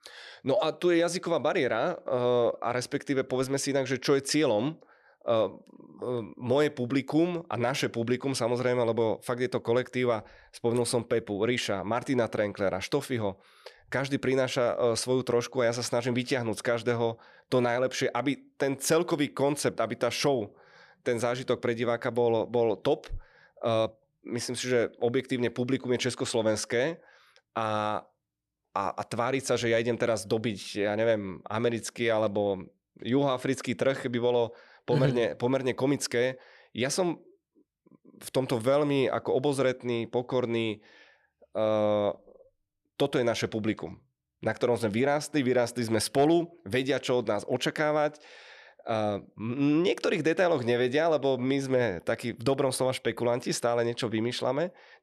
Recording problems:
none

